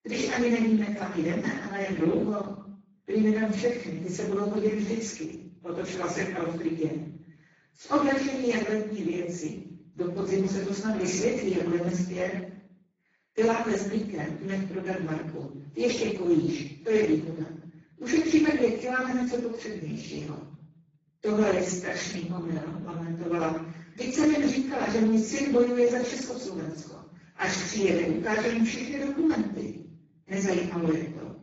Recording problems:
off-mic speech; far
garbled, watery; badly; nothing above 7 kHz
room echo; noticeable; dies away in 0.7 s

